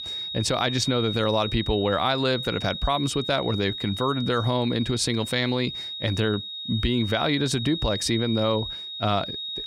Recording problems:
high-pitched whine; loud; throughout; 3.5 kHz, 6 dB below the speech

